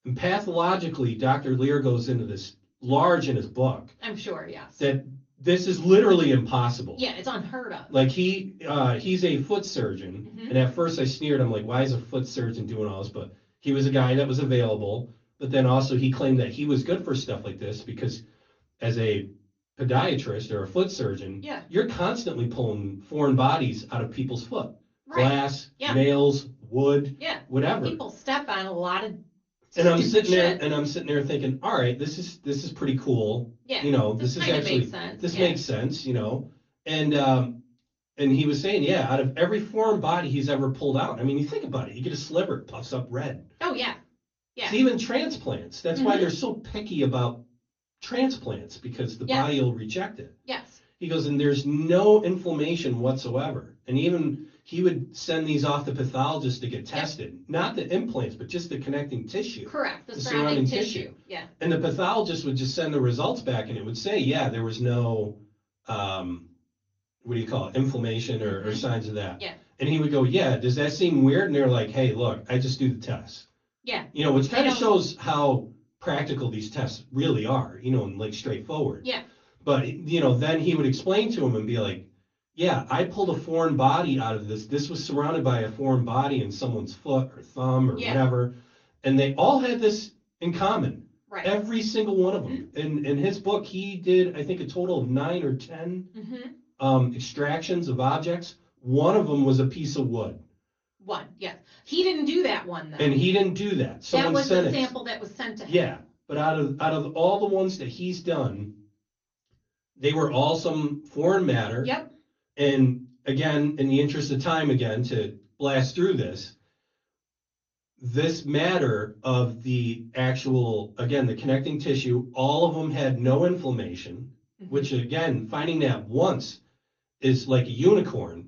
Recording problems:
off-mic speech; far
room echo; very slight; dies away in 0.2 s
garbled, watery; slightly; nothing above 6.5 kHz

